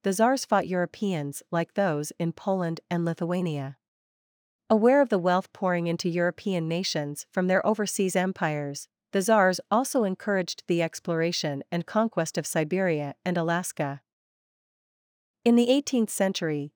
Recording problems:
none

